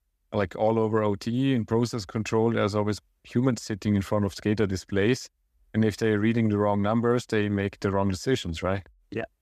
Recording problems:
none

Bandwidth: 14.5 kHz